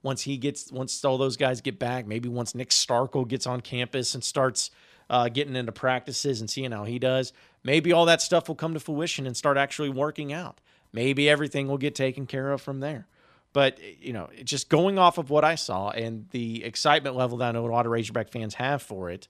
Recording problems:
none

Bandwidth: 14 kHz